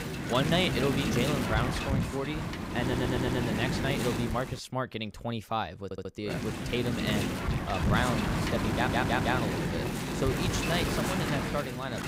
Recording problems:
wind noise on the microphone; heavy; until 4.5 s and from 6.5 s on; 1 dB below the speech
audio stuttering; at 3 s, at 6 s and at 8.5 s

